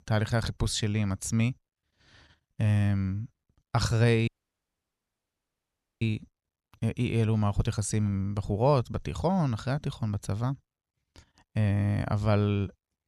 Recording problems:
audio cutting out; at 4.5 s for 1.5 s

